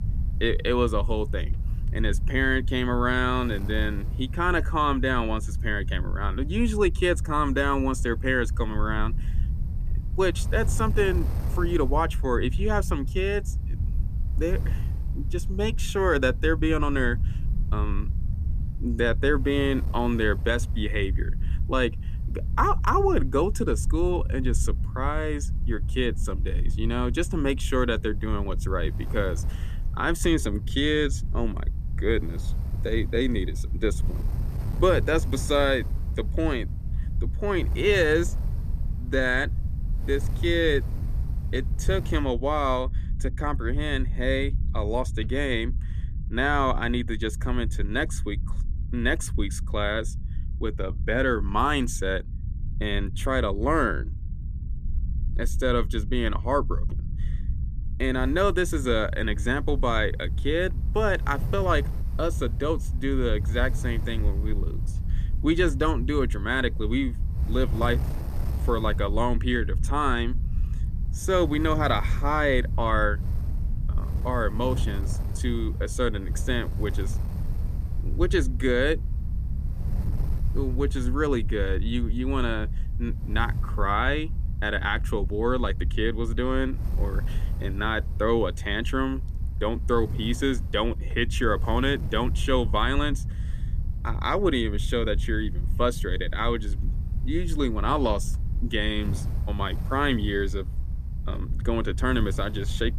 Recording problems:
wind noise on the microphone; occasional gusts; until 42 s and from 58 s on; 25 dB below the speech
low rumble; faint; throughout; 20 dB below the speech

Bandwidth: 14.5 kHz